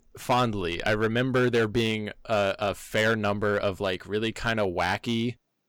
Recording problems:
distortion; slight; 4% of the sound clipped

